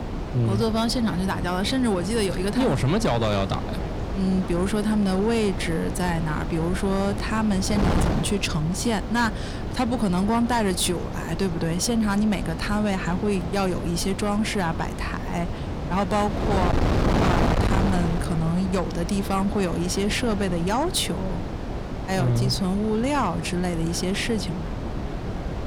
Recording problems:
distortion; slight; 10 dB below the speech
wind noise on the microphone; heavy; 6 dB below the speech
voice in the background; faint; throughout; 30 dB below the speech

